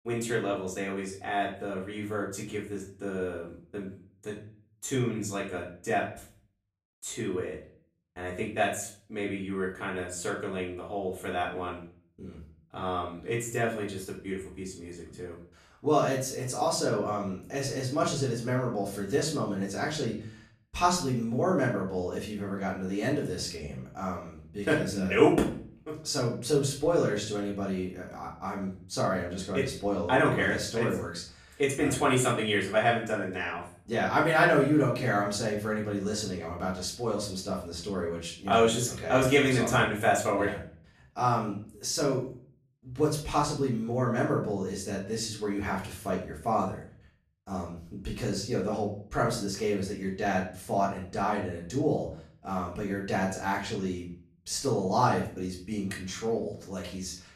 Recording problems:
off-mic speech; far
room echo; slight; dies away in 0.4 s

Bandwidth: 14.5 kHz